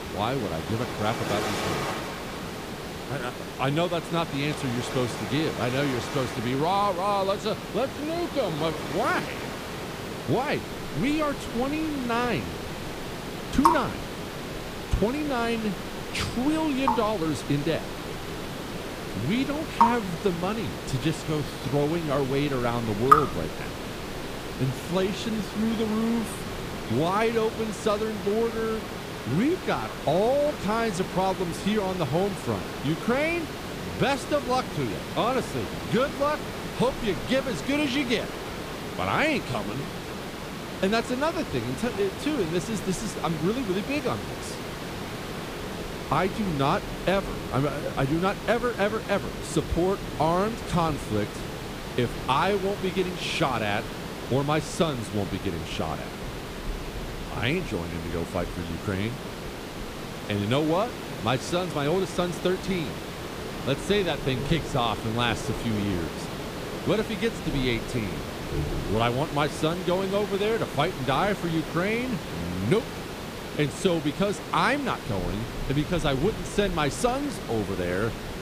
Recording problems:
rain or running water; loud; throughout; 8 dB below the speech
hiss; loud; throughout; 7 dB below the speech

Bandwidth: 15 kHz